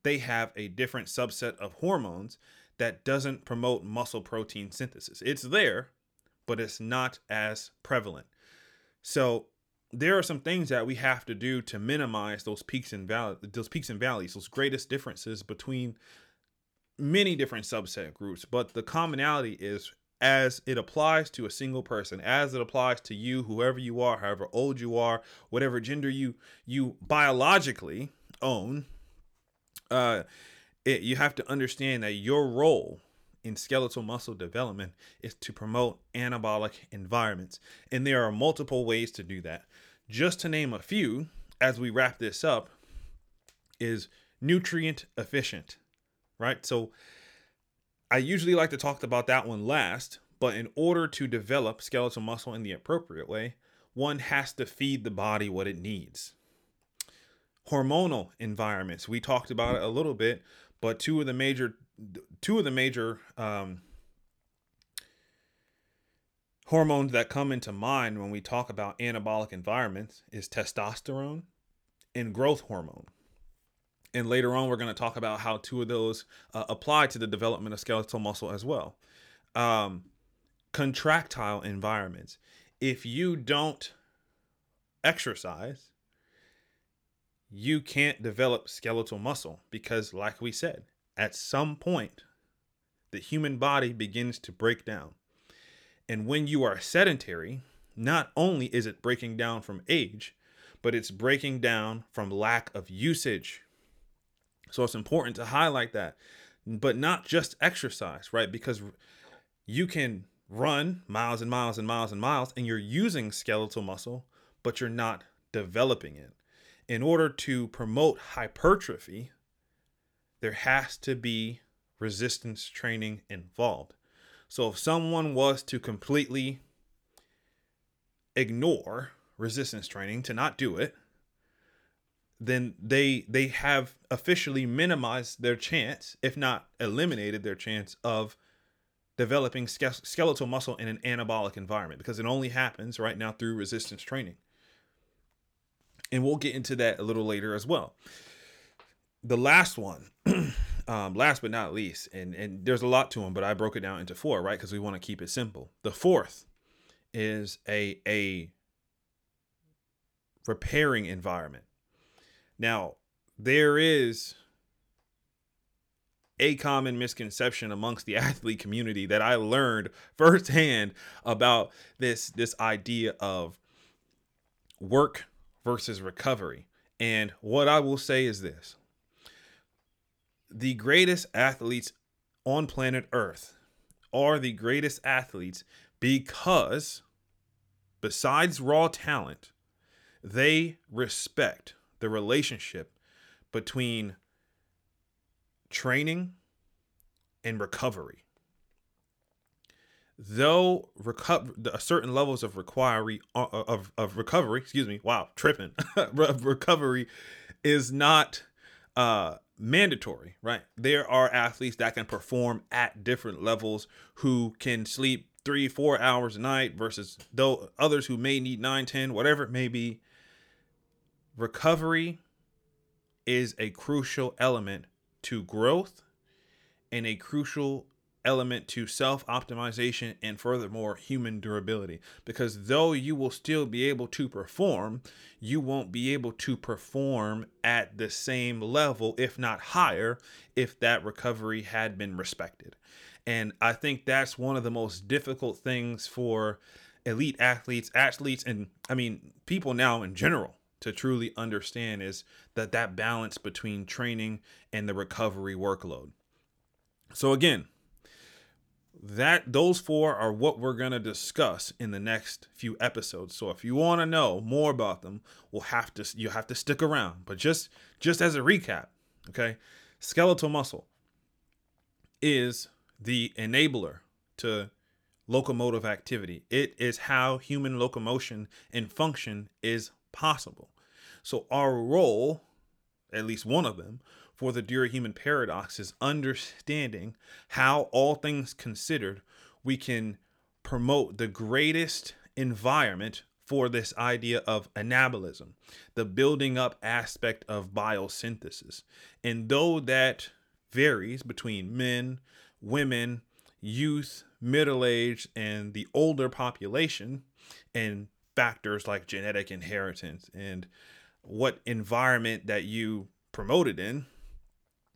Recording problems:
none

